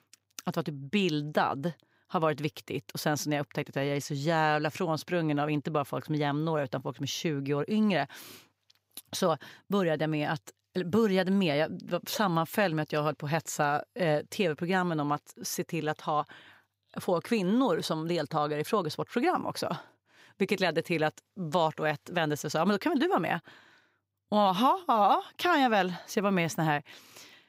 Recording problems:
none

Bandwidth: 15.5 kHz